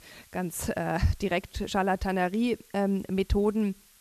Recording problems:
hiss; faint; throughout; 25 dB below the speech

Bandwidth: 13.5 kHz